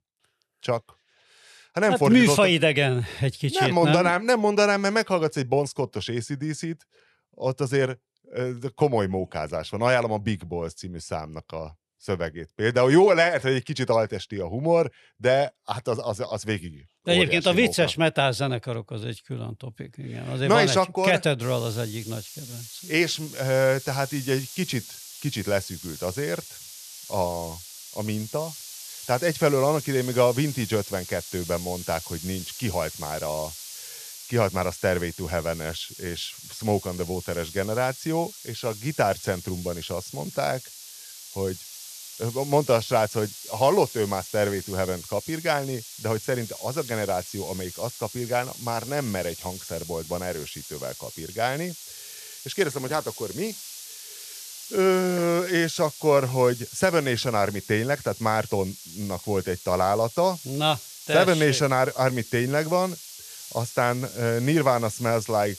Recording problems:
hiss; noticeable; from 21 s on; 15 dB below the speech

